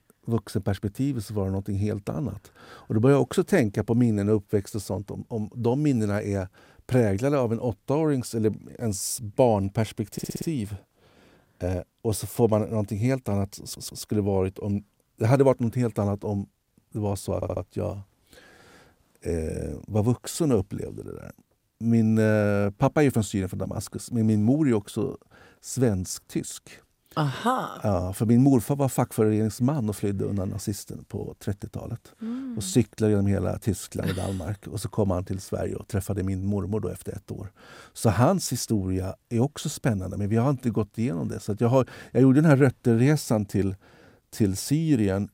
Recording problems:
audio stuttering; at 10 s, at 14 s and at 17 s

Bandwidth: 16 kHz